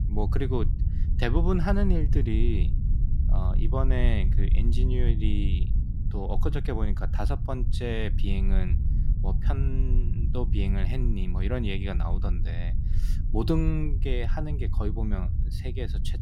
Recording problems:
low rumble; loud; throughout; 9 dB below the speech

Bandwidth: 16 kHz